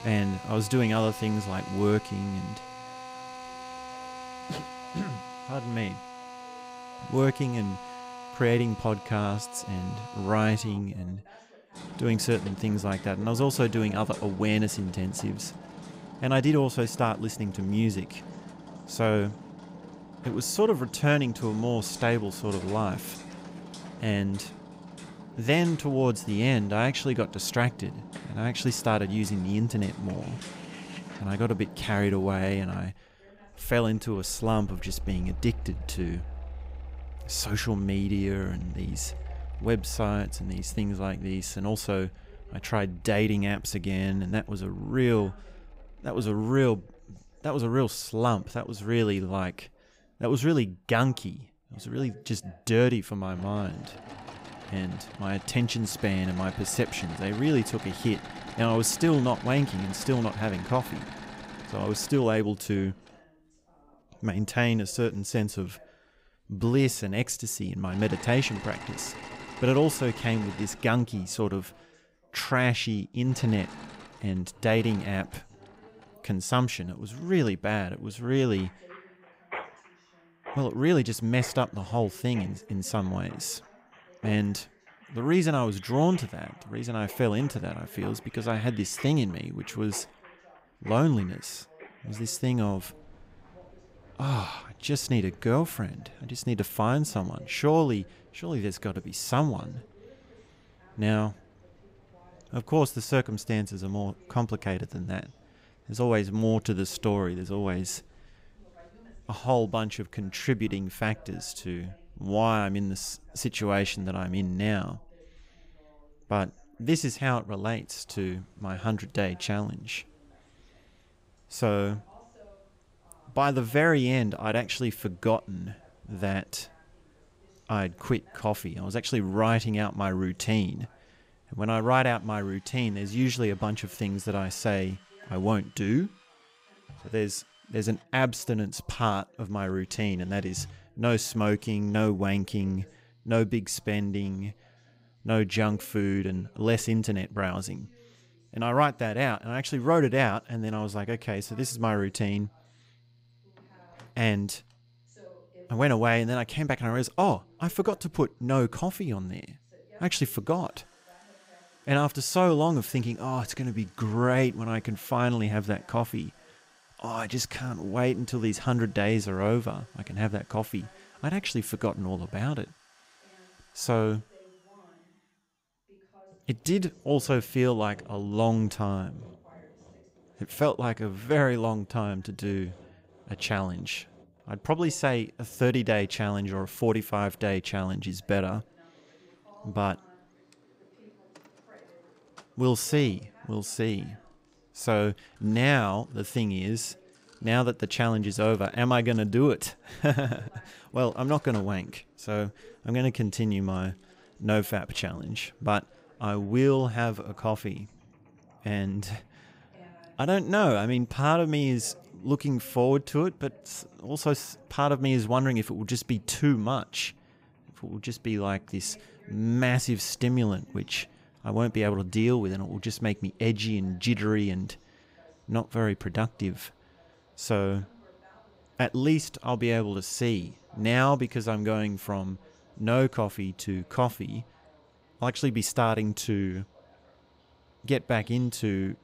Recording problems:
machinery noise; noticeable; throughout; 15 dB below the speech
voice in the background; faint; throughout; 30 dB below the speech

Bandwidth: 15.5 kHz